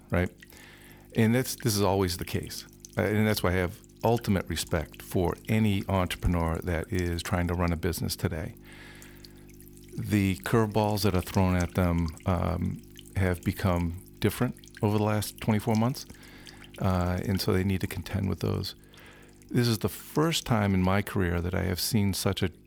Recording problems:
electrical hum; faint; throughout; 50 Hz, 20 dB below the speech

